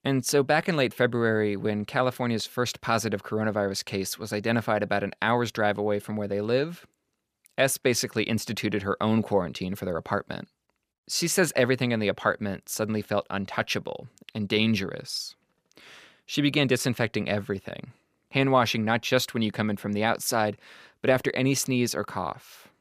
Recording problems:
none

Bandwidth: 15 kHz